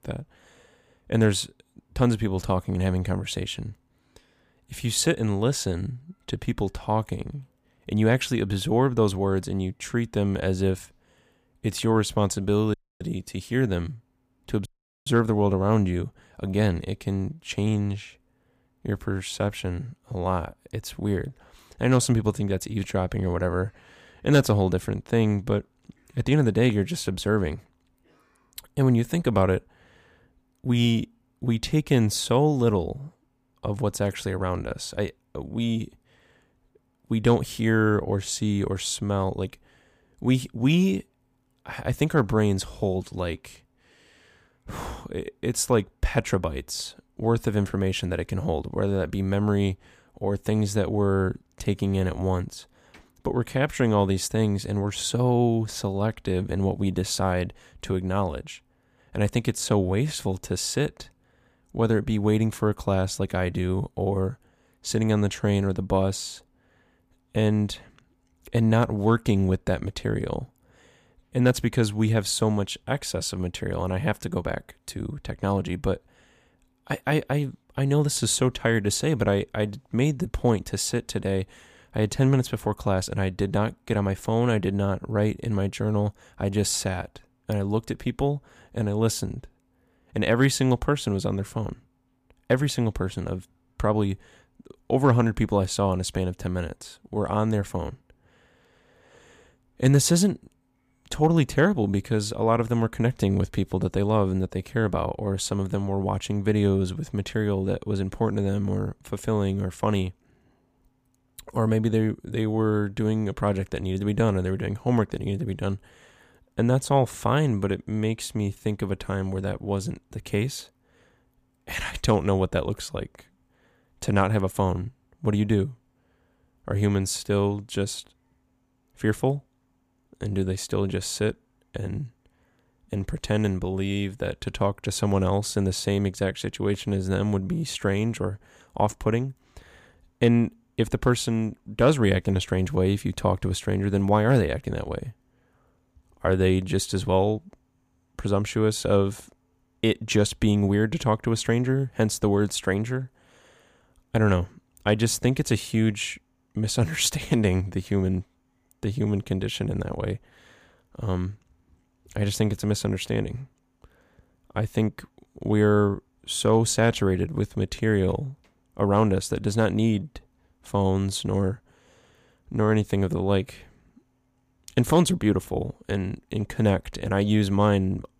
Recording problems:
audio cutting out; at 13 s and at 15 s

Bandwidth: 15 kHz